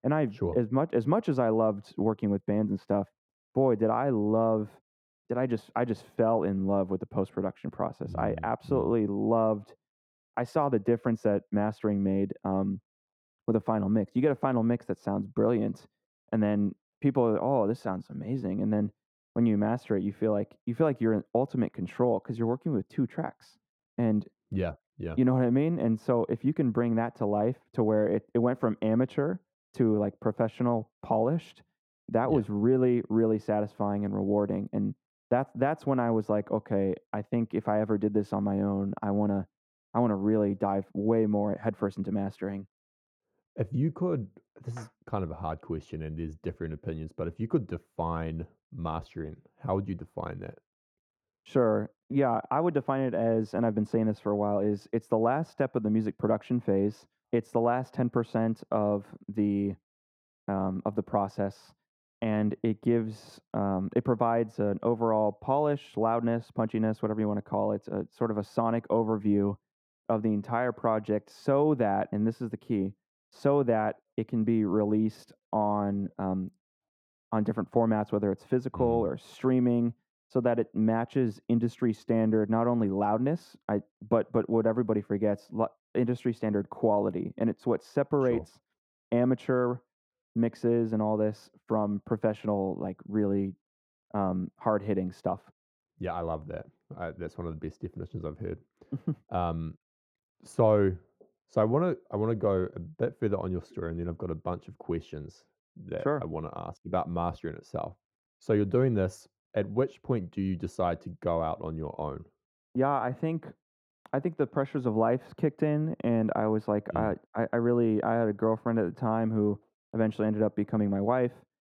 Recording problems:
muffled; very; fading above 2 kHz

